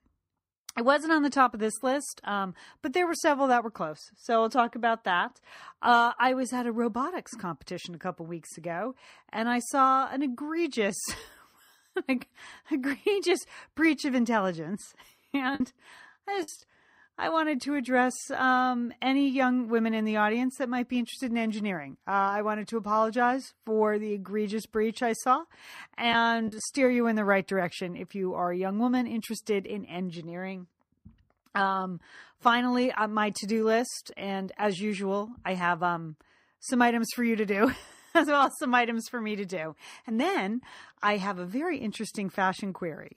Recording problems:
choppy; very; at 26 s; 6% of the speech affected

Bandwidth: 15.5 kHz